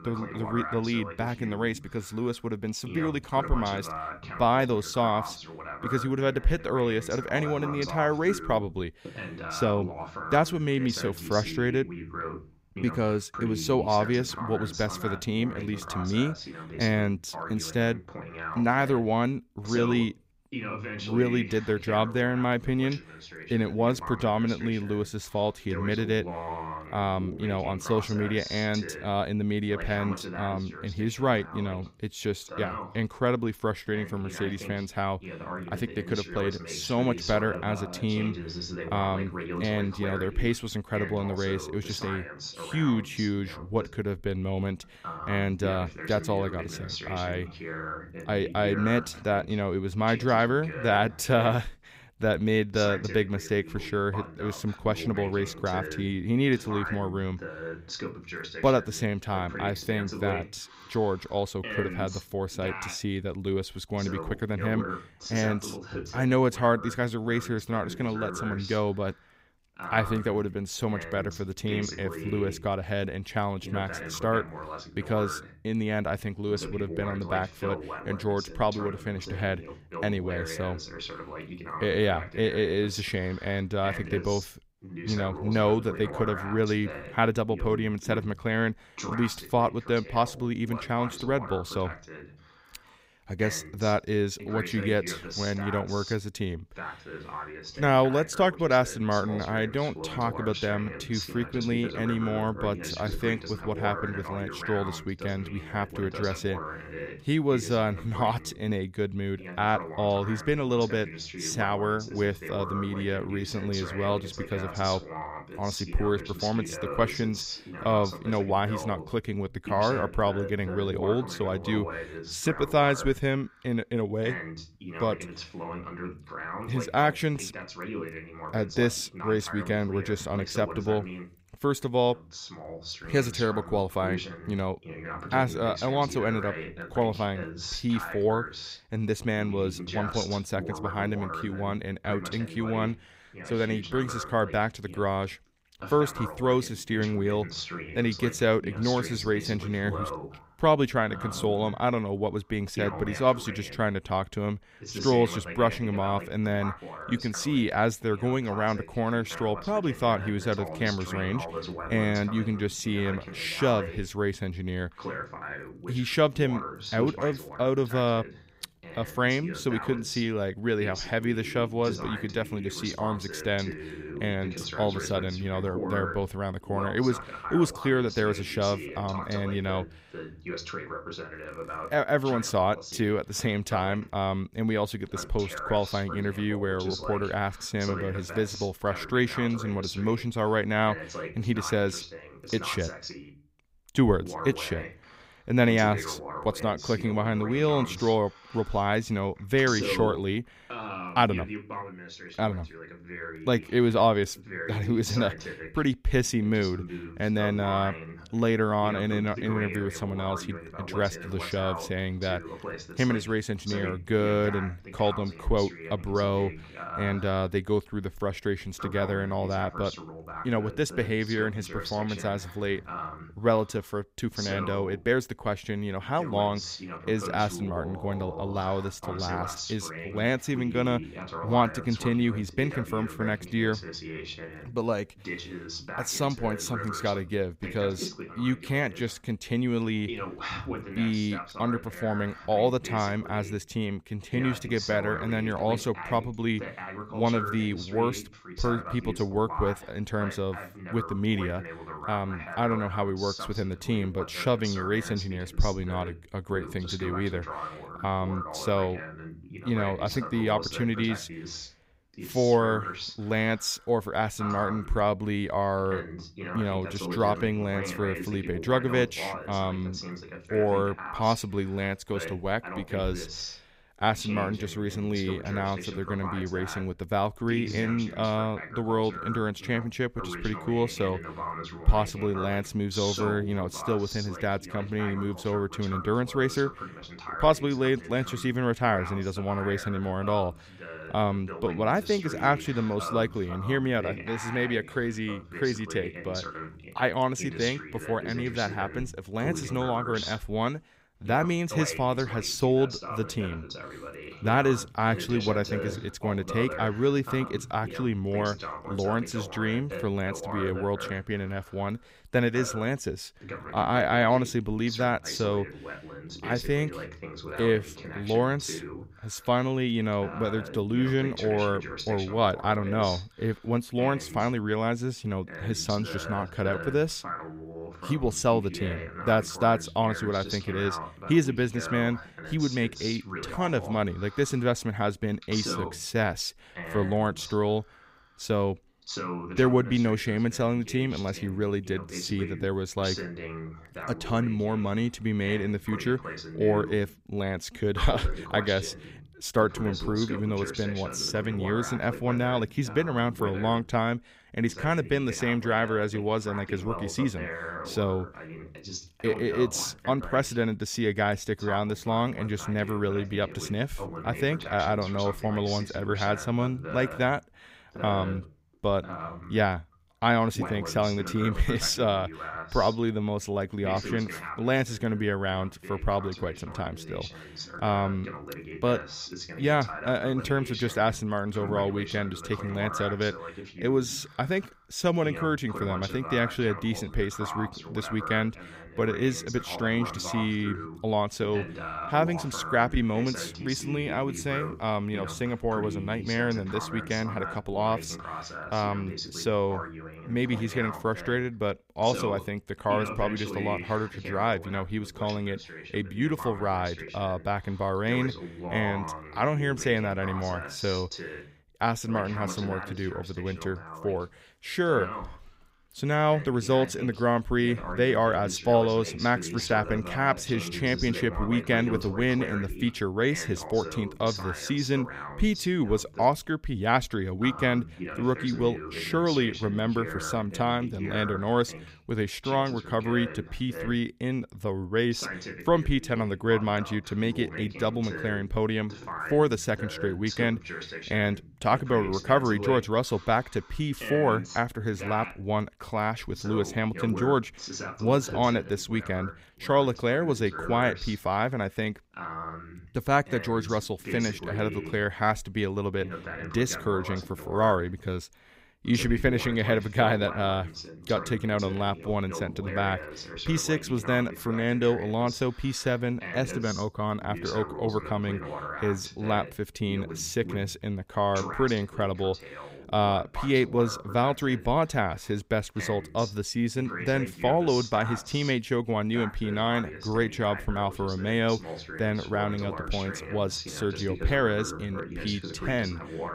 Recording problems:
voice in the background; loud; throughout; 10 dB below the speech

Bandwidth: 15.5 kHz